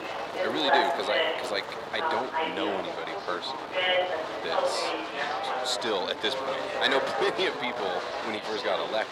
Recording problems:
thin; very; fading below 700 Hz
muffled; very slightly; fading above 2 kHz
chatter from many people; very loud; throughout; 1 dB above the speech
wind noise on the microphone; heavy; 8 dB below the speech
rain or running water; noticeable; until 2 s; 15 dB below the speech

